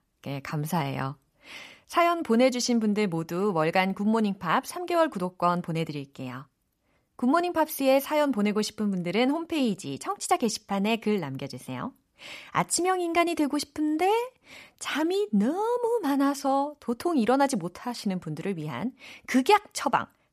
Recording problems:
none

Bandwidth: 14.5 kHz